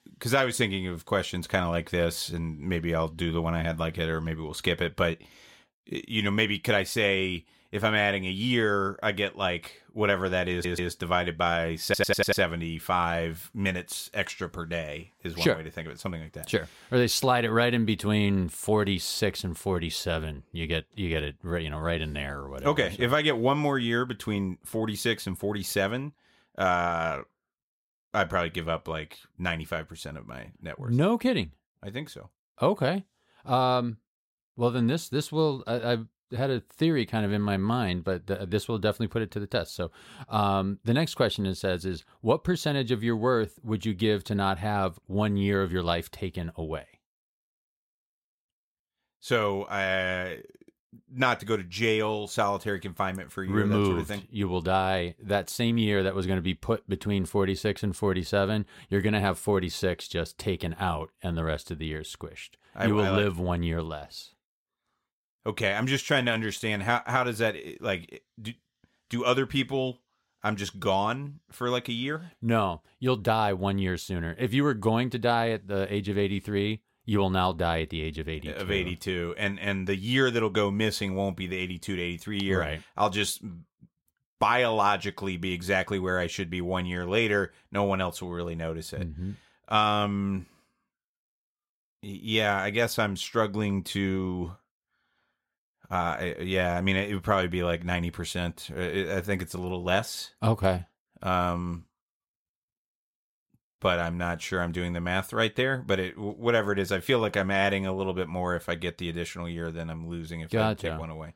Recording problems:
audio stuttering; at 11 s and at 12 s

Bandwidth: 16 kHz